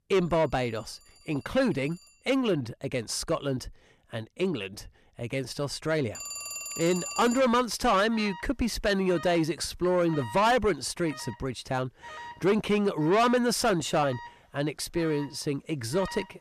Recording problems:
distortion; heavy; 8 dB below the speech
alarms or sirens; noticeable; throughout; 15 dB below the speech

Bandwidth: 14 kHz